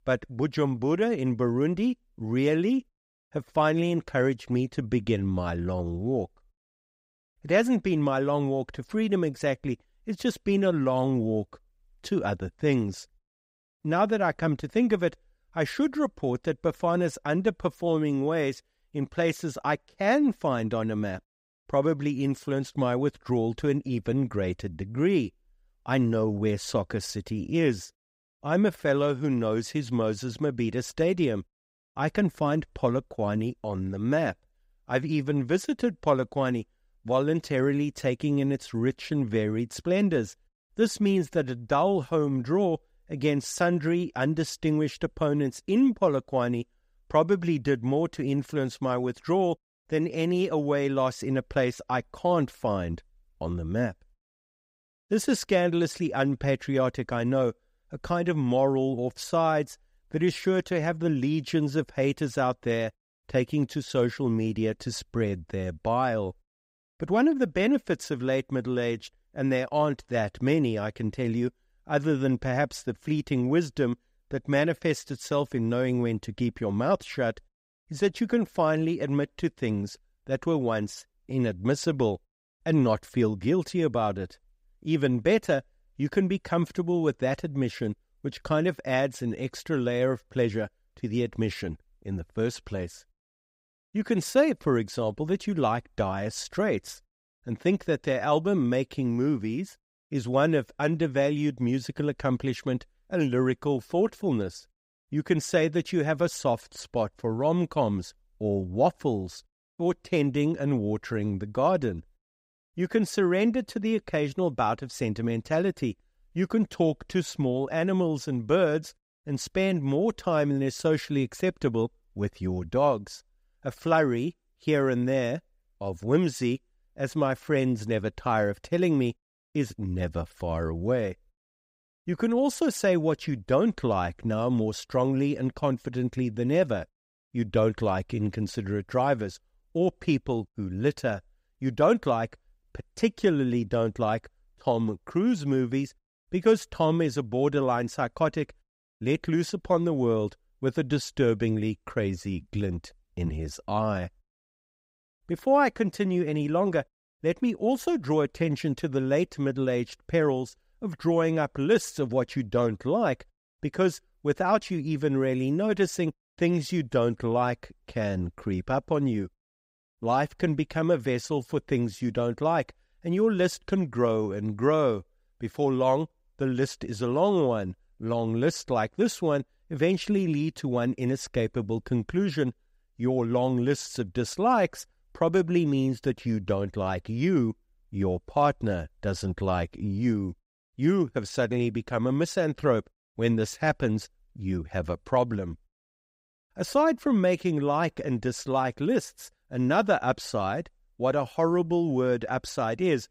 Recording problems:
none

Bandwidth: 15.5 kHz